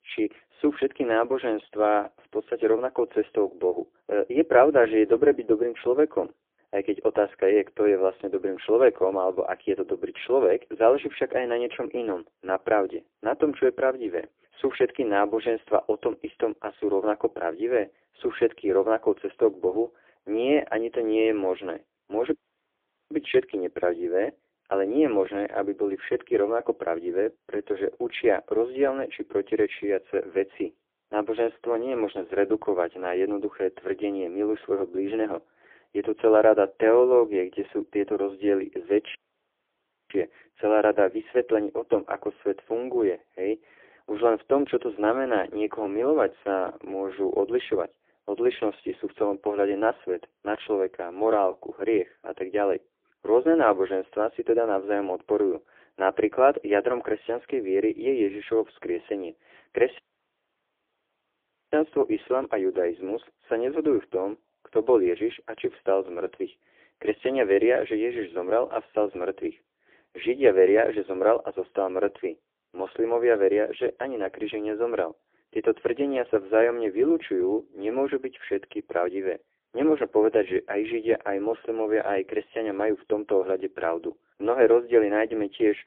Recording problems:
phone-call audio; poor line; nothing above 3.5 kHz
audio cutting out; at 22 s for 1 s, at 39 s for 1 s and at 1:00 for 1.5 s

